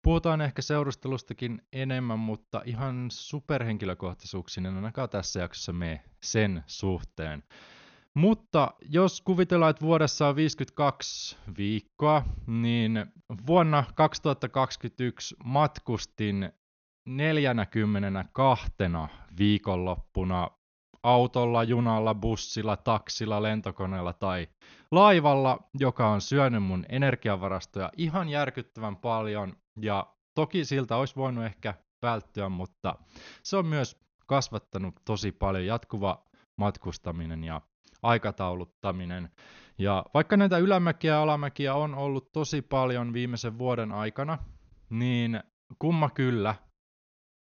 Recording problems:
high frequencies cut off; noticeable; nothing above 6.5 kHz

